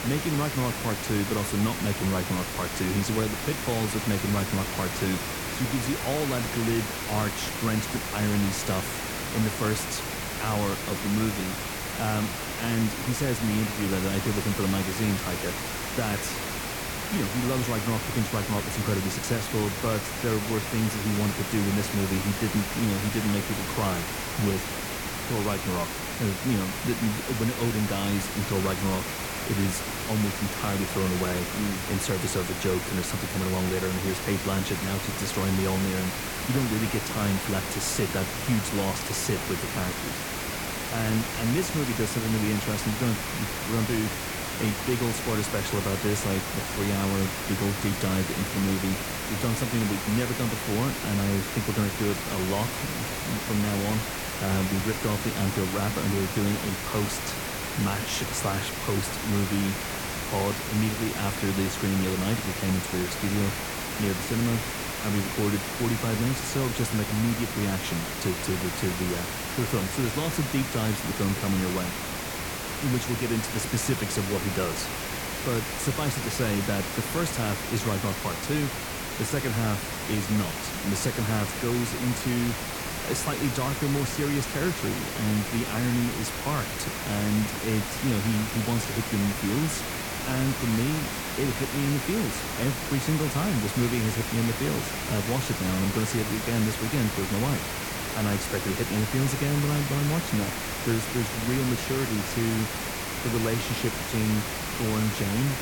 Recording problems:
hiss; loud; throughout; 2 dB below the speech

